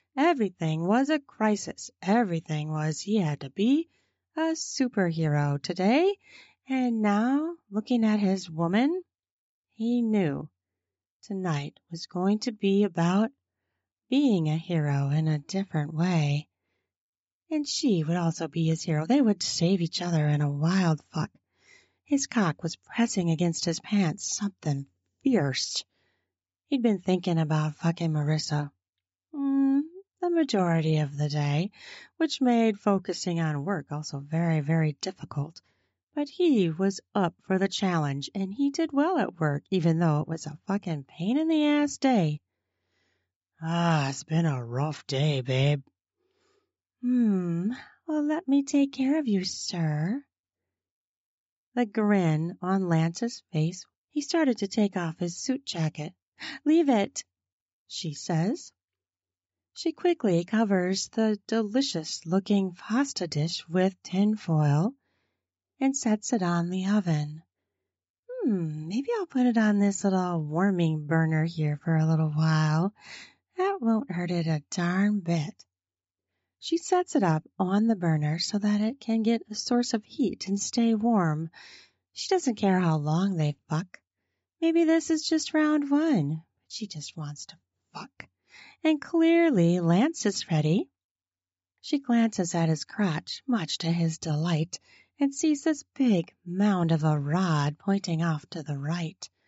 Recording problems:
high frequencies cut off; noticeable; nothing above 8 kHz

